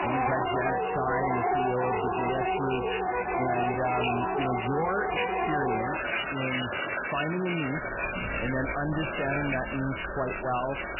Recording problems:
garbled, watery; badly; nothing above 3 kHz
distortion; slight; 8 dB below the speech
household noises; very loud; throughout; 2 dB above the speech
rain or running water; loud; throughout; 9 dB below the speech
electrical hum; faint; throughout; 60 Hz, 25 dB below the speech

